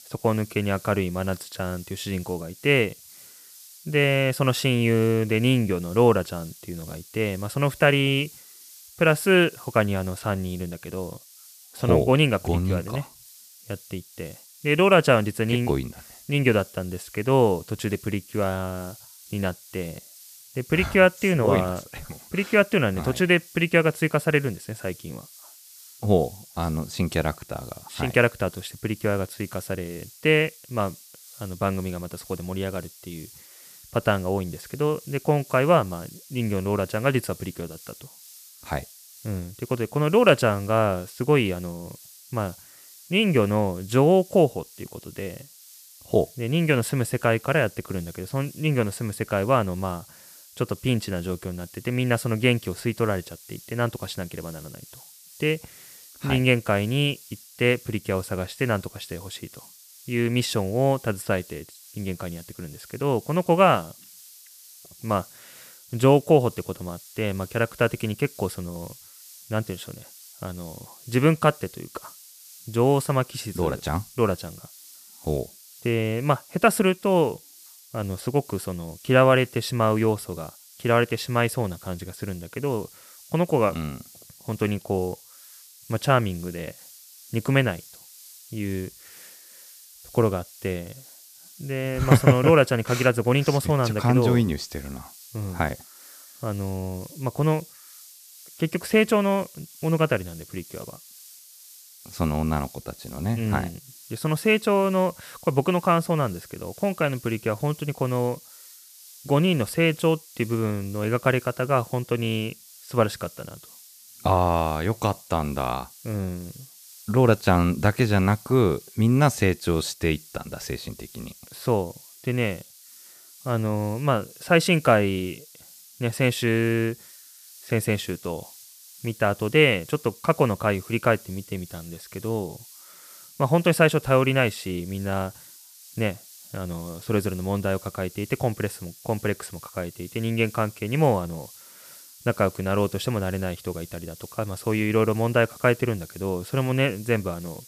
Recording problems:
hiss; faint; throughout; 20 dB below the speech

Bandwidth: 14.5 kHz